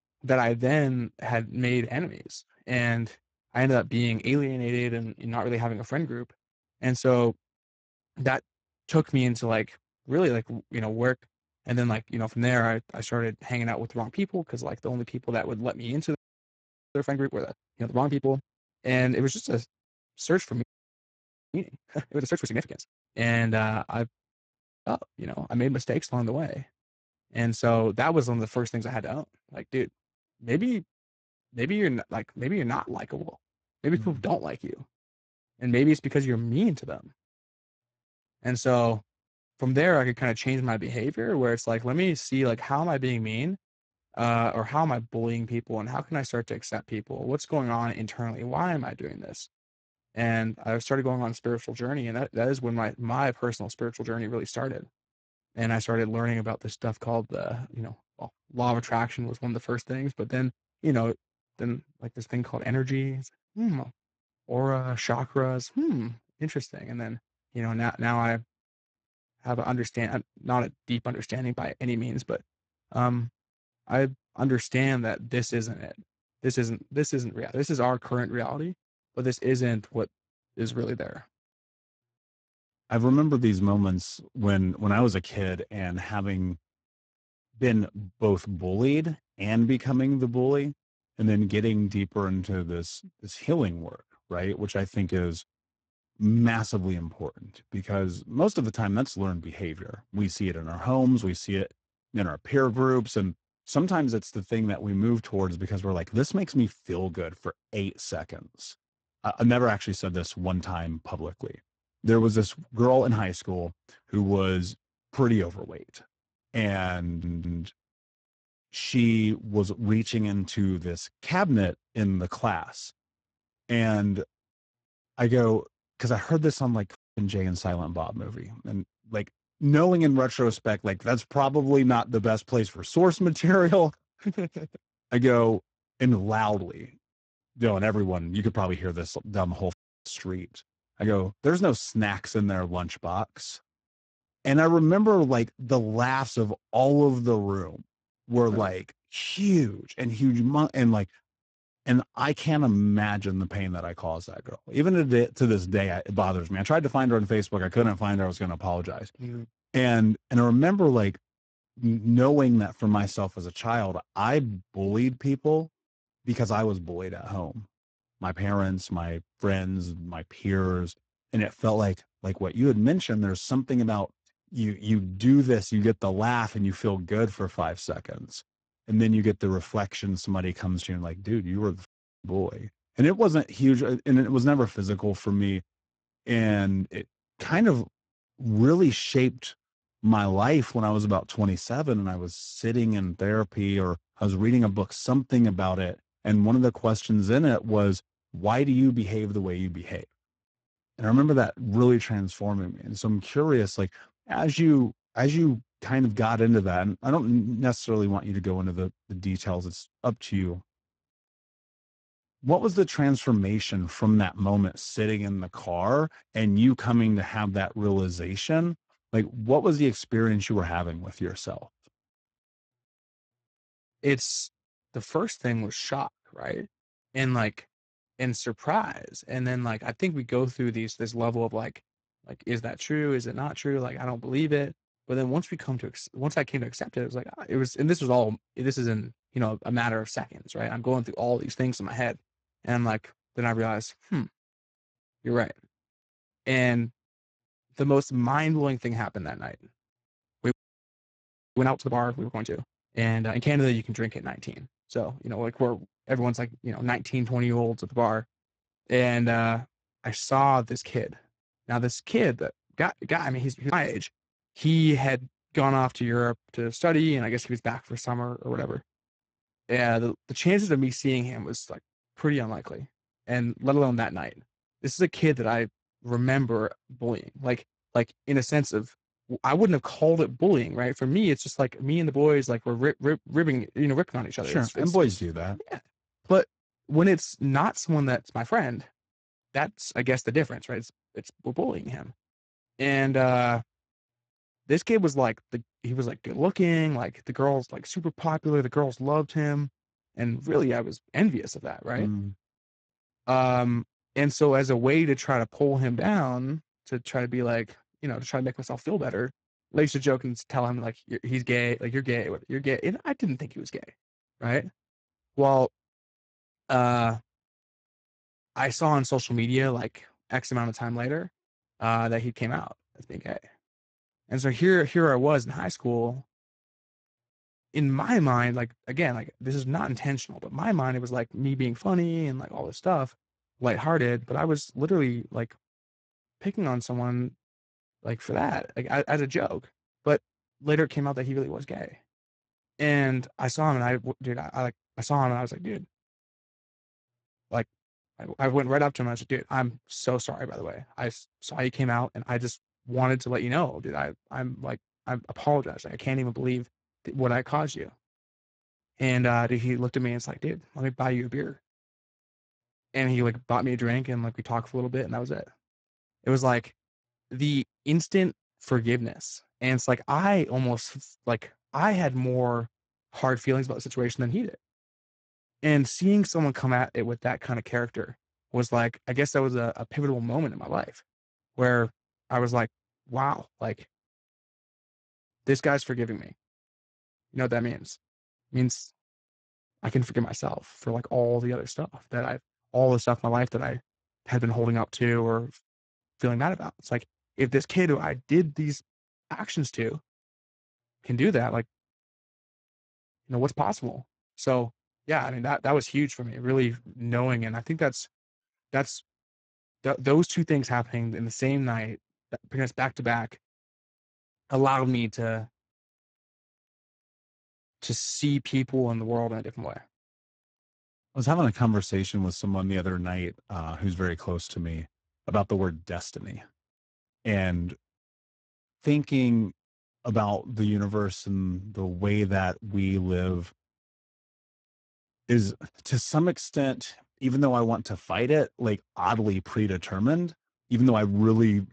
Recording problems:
garbled, watery; badly; nothing above 8 kHz
audio freezing; at 16 s for 1 s, at 21 s for 1 s and at 4:11 for 1 s
audio stuttering; at 1:57

